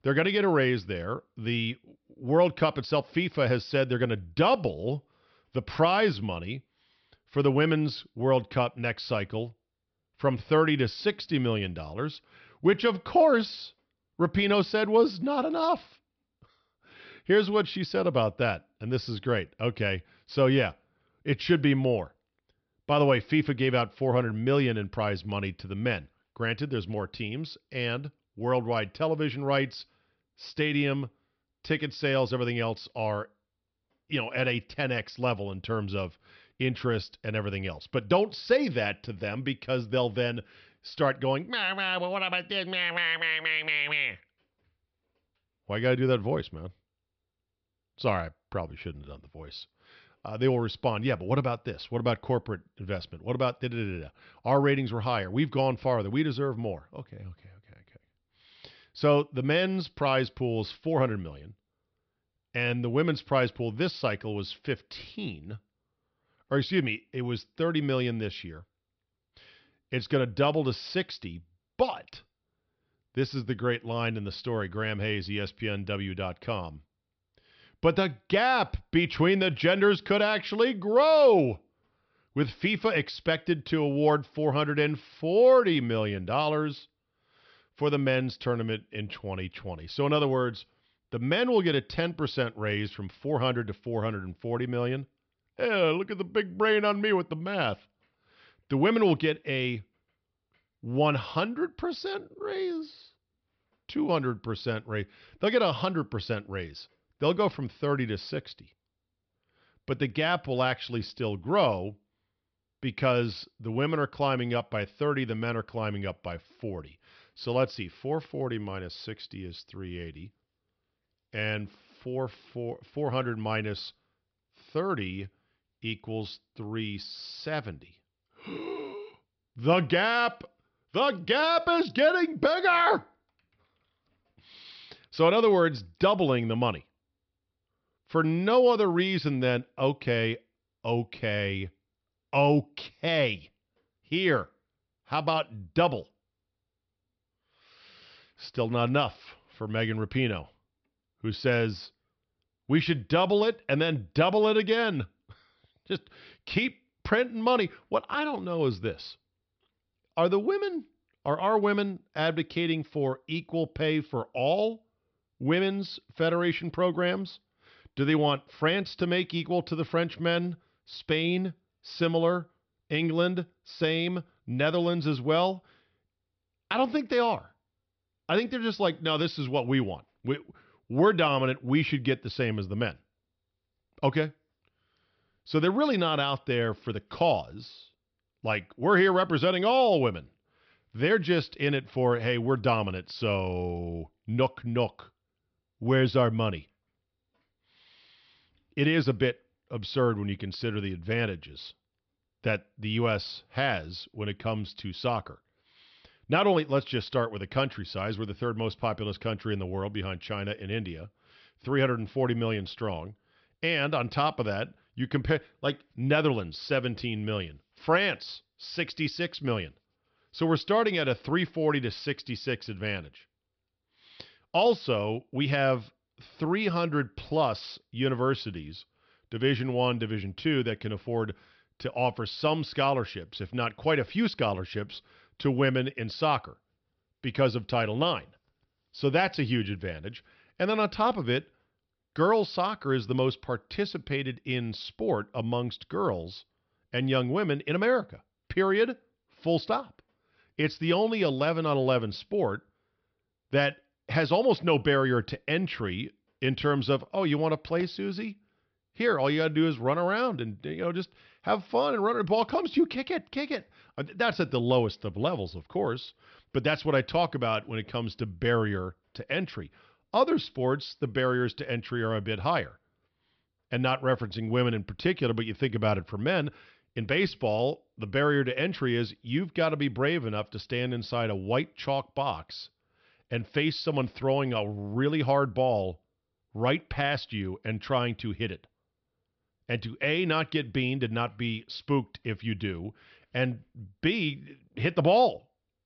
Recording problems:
high frequencies cut off; noticeable; nothing above 5.5 kHz

